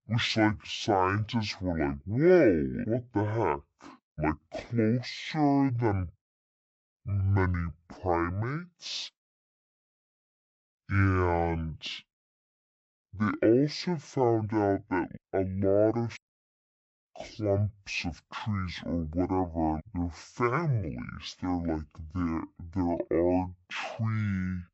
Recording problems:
wrong speed and pitch; too slow and too low; 0.5 times normal speed

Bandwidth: 8 kHz